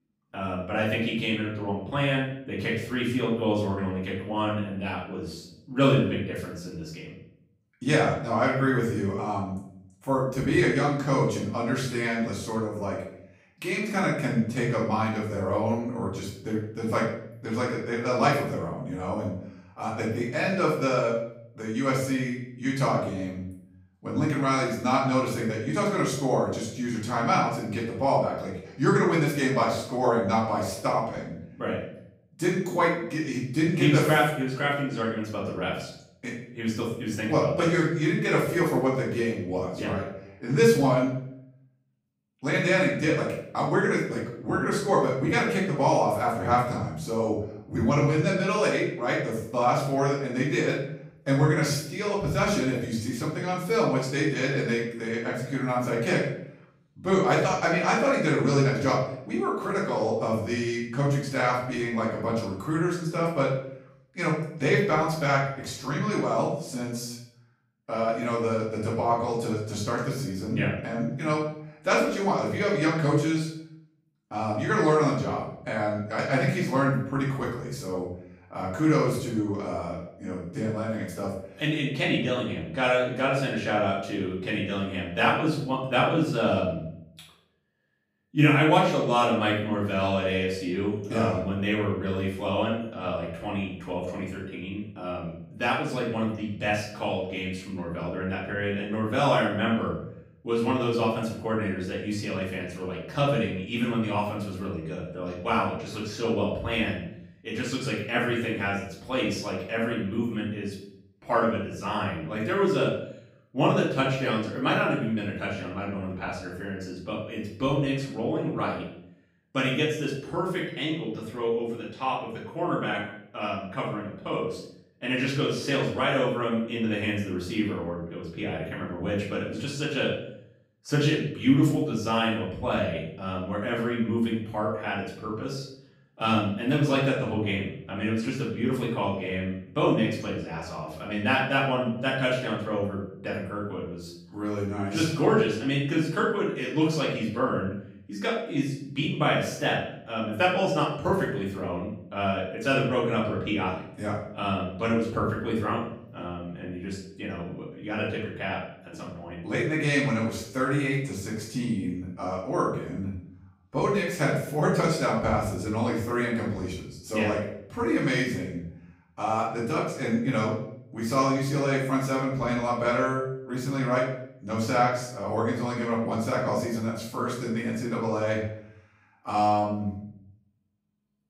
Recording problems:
off-mic speech; far
room echo; noticeable; dies away in 0.6 s

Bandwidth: 15.5 kHz